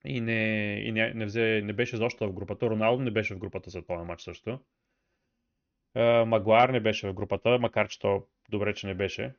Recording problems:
high frequencies cut off; noticeable; nothing above 6.5 kHz

